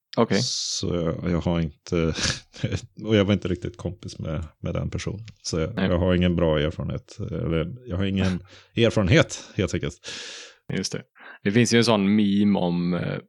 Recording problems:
none

